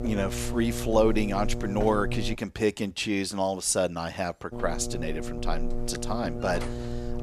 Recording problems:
electrical hum; loud; until 2.5 s and from 4.5 s on; 60 Hz, 10 dB below the speech

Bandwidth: 14.5 kHz